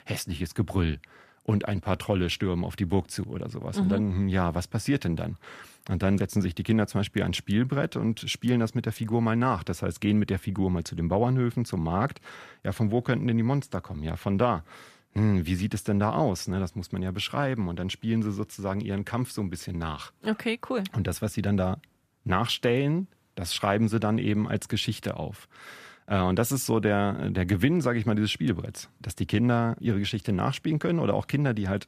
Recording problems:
none

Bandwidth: 14.5 kHz